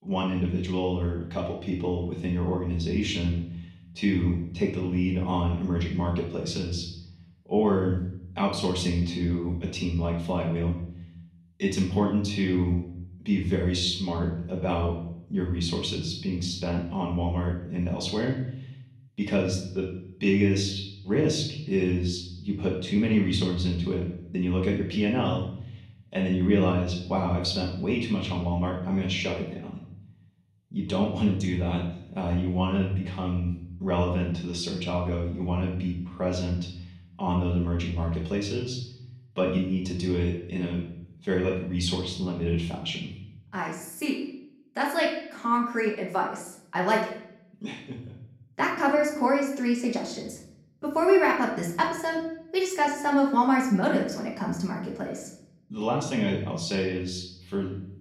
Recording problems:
off-mic speech; far
room echo; noticeable; dies away in 0.7 s

